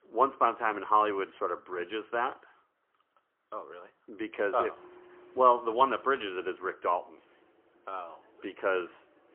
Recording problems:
phone-call audio; poor line; nothing above 3 kHz
traffic noise; faint; from 4.5 s on; 30 dB below the speech

